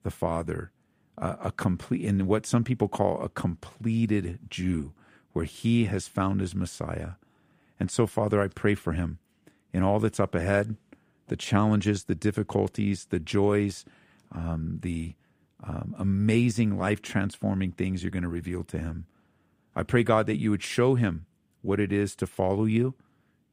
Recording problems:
none

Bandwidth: 15.5 kHz